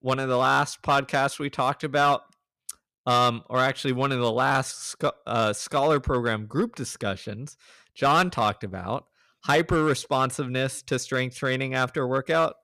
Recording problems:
distortion; slight; 3% of the sound clipped

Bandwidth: 14.5 kHz